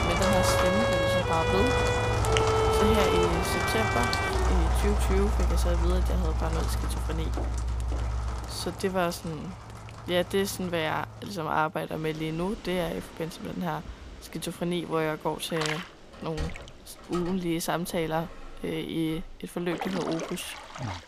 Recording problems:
background music; very loud; until 8.5 s; 2 dB above the speech
rain or running water; loud; throughout; 1 dB below the speech
footsteps; noticeable; from 7.5 to 8.5 s; peak 10 dB below the speech
door banging; noticeable; from 16 to 19 s; peak 7 dB below the speech

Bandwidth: 15 kHz